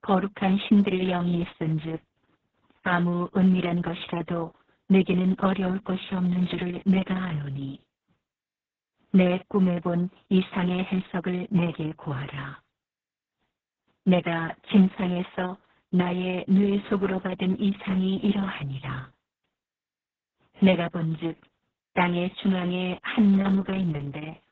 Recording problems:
garbled, watery; badly

